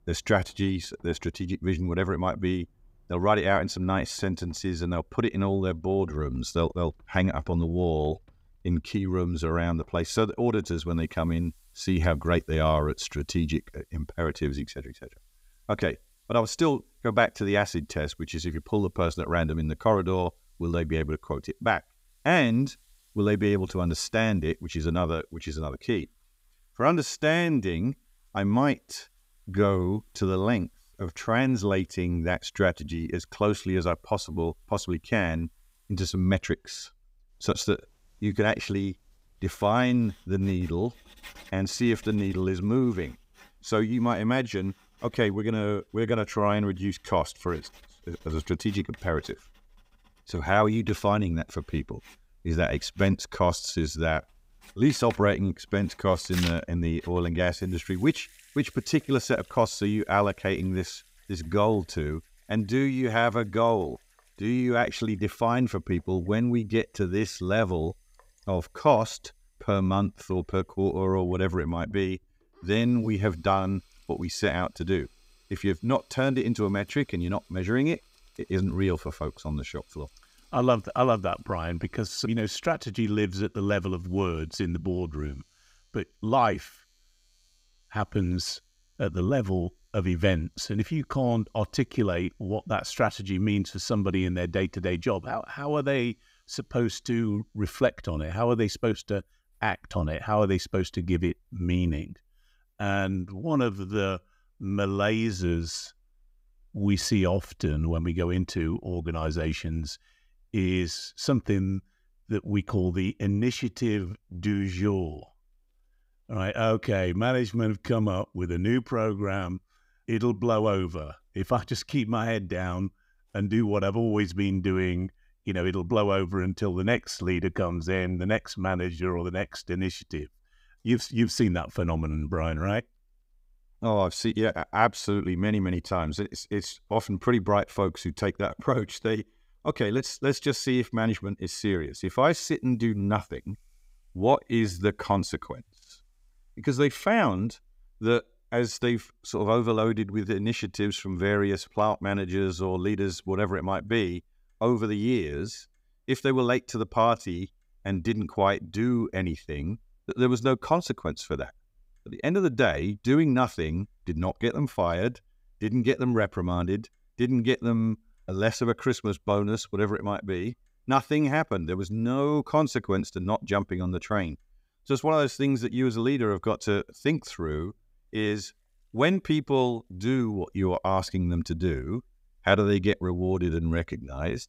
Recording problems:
household noises; faint; throughout; 25 dB below the speech

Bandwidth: 15.5 kHz